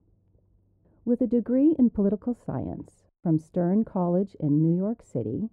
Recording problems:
muffled; very; fading above 1.5 kHz

